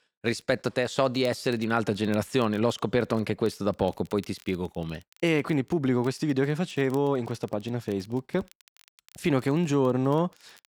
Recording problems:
crackle, like an old record; faint; 30 dB below the speech

